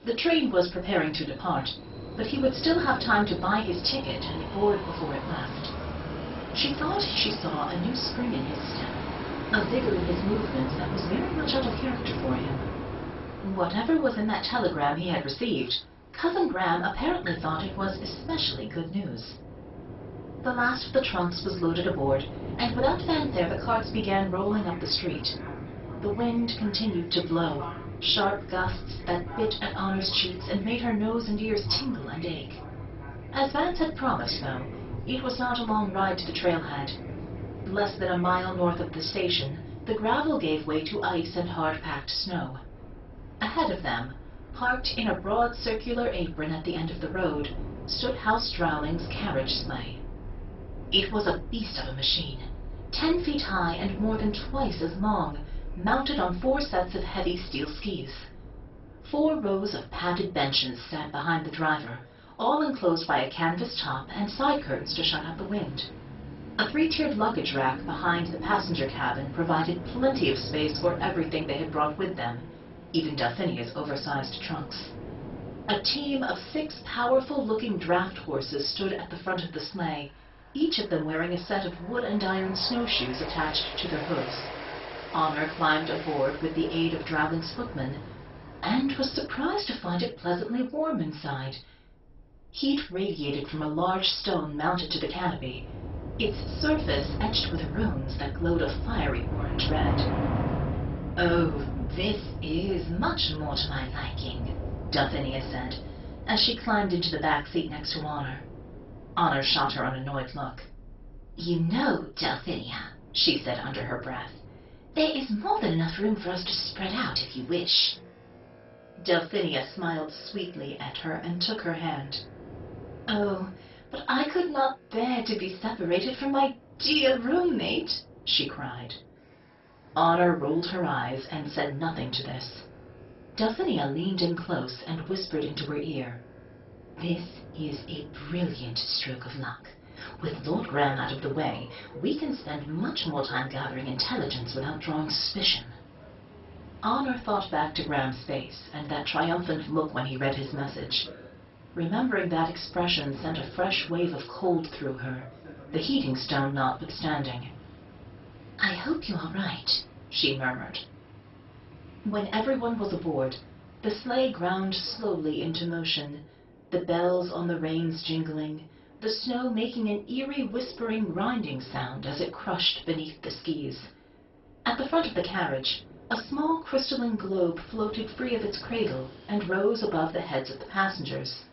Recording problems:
off-mic speech; far
garbled, watery; badly; nothing above 5.5 kHz
room echo; slight; dies away in 0.2 s
train or aircraft noise; noticeable; throughout; 10 dB below the speech

